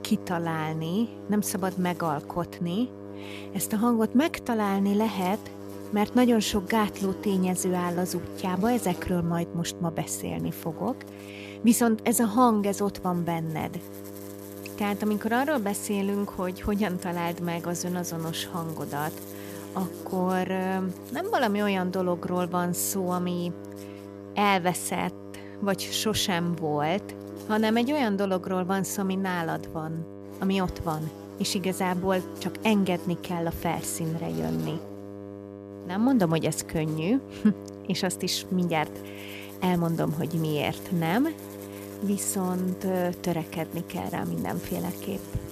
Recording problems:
electrical hum; noticeable; throughout; 50 Hz, 15 dB below the speech

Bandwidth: 14.5 kHz